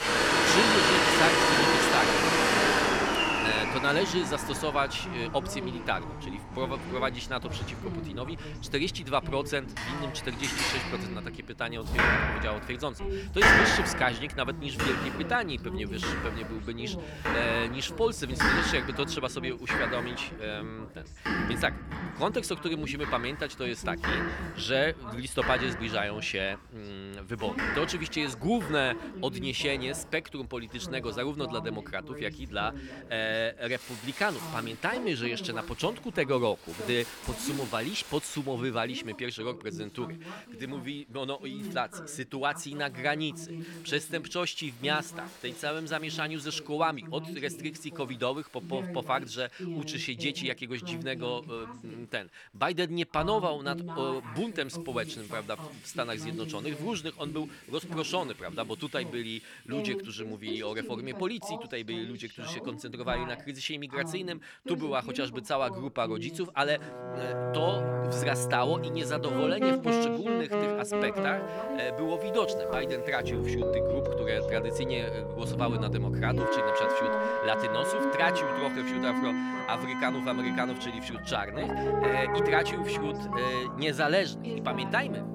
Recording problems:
household noises; very loud; throughout; 4 dB above the speech
background music; very loud; from 1:07 on; 1 dB above the speech
voice in the background; loud; throughout; 10 dB below the speech

